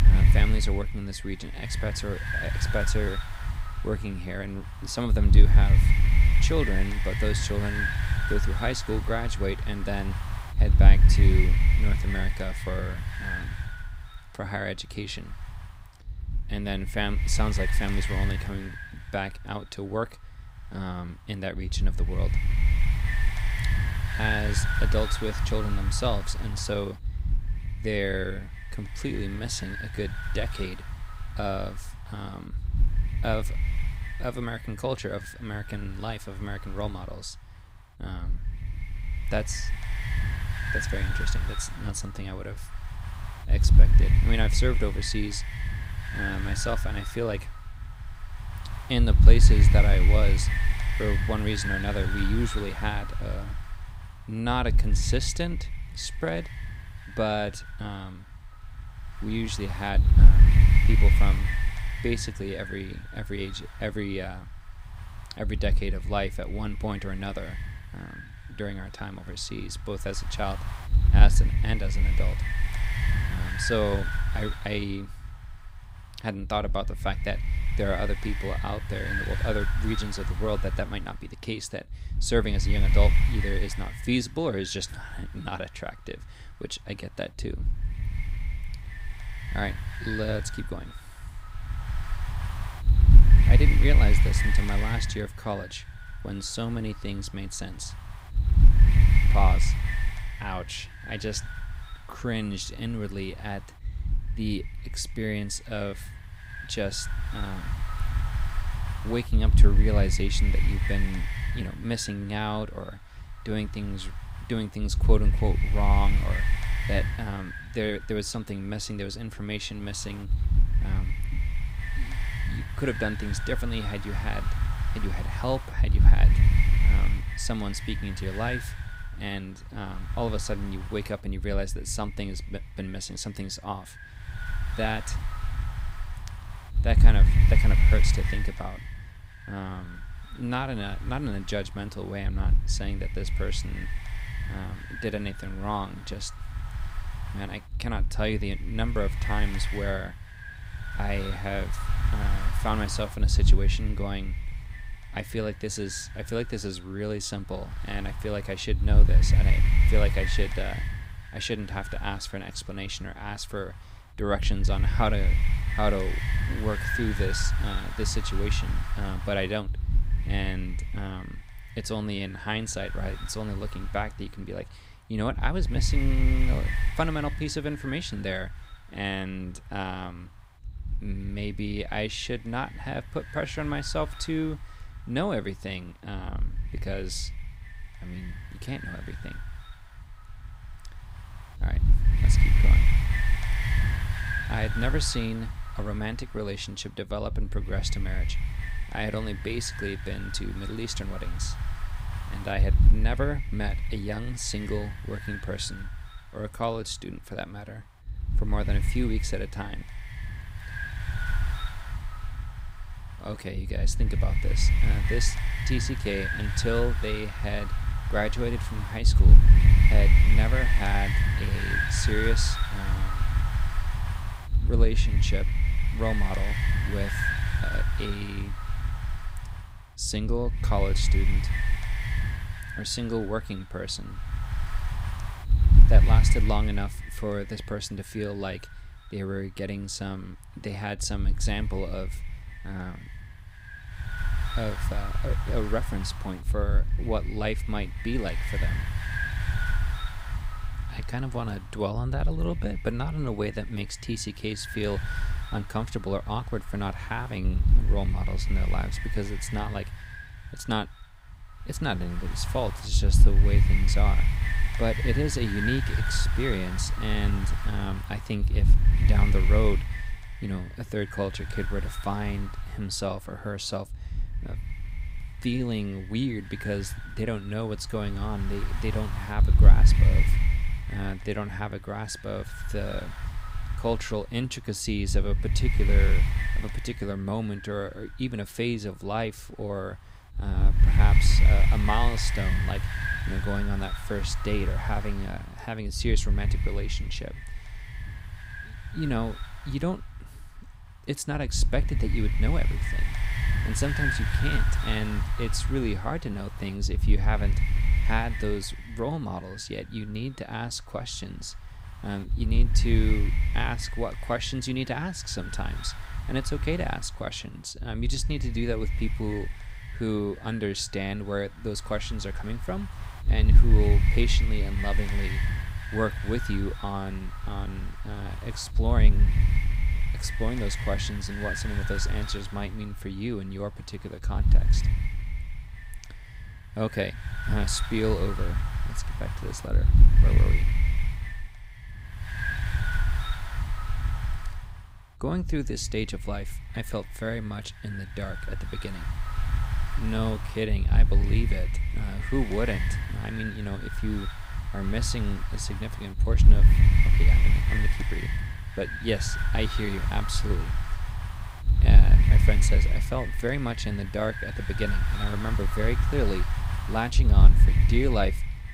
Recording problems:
wind noise on the microphone; heavy; 3 dB below the speech

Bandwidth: 15.5 kHz